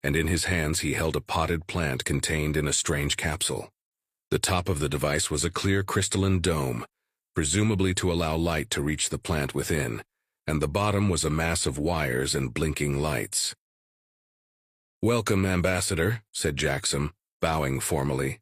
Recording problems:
none

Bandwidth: 15 kHz